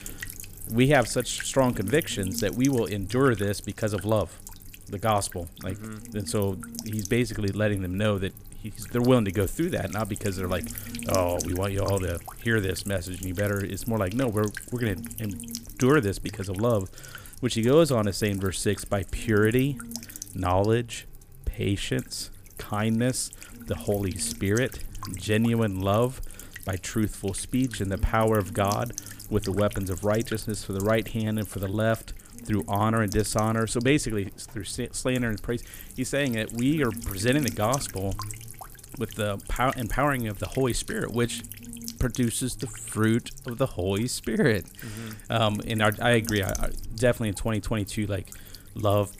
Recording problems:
electrical hum; noticeable; throughout; 60 Hz, 15 dB below the speech

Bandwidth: 15 kHz